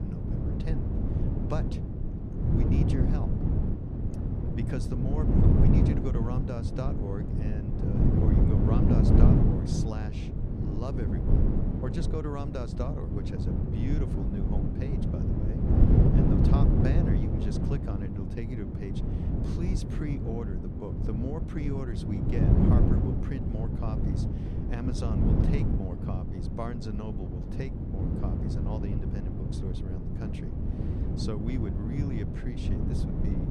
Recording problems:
wind noise on the microphone; heavy; 4 dB above the speech

